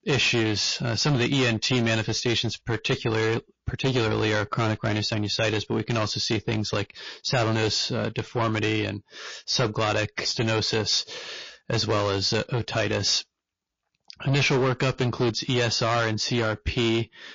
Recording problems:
distortion; heavy; 13% of the sound clipped
garbled, watery; slightly; nothing above 6.5 kHz

